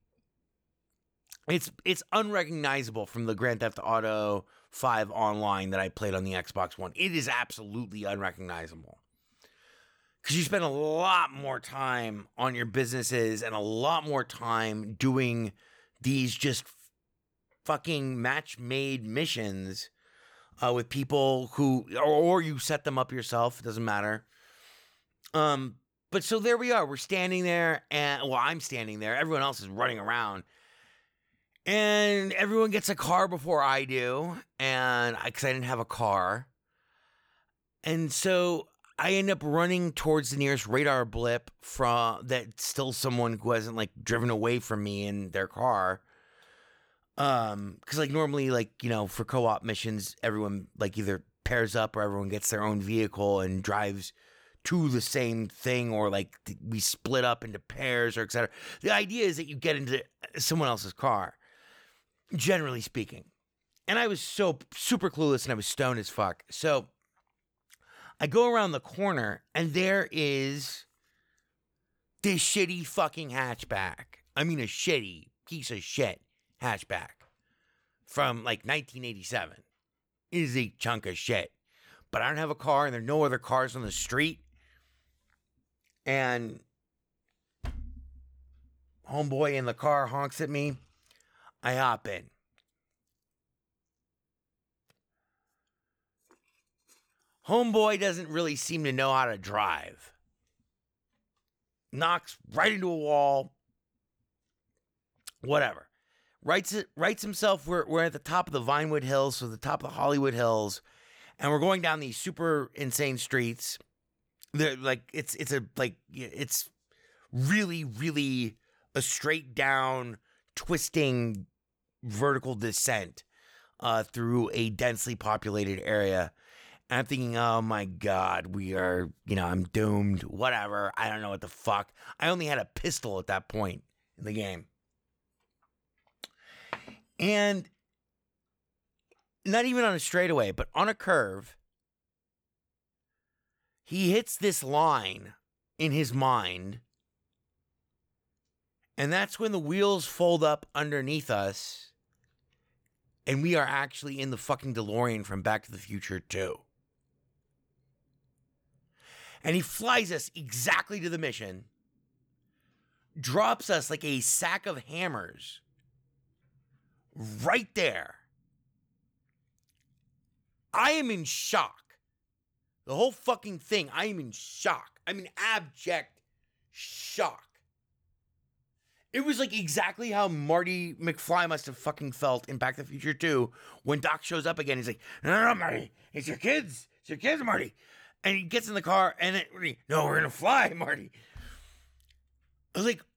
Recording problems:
none

